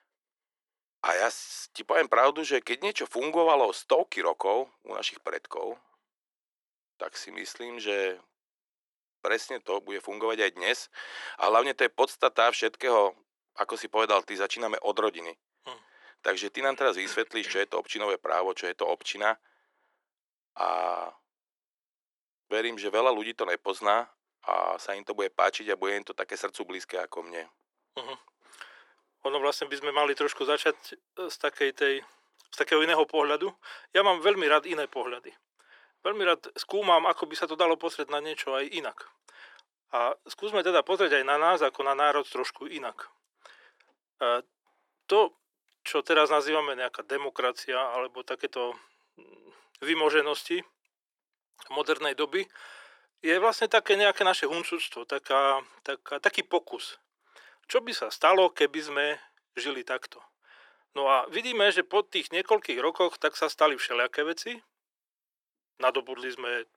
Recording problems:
thin; very; fading below 400 Hz

